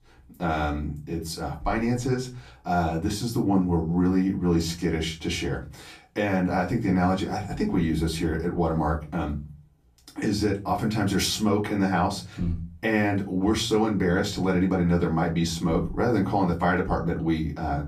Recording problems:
off-mic speech; far
room echo; very slight; dies away in 0.3 s

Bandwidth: 14.5 kHz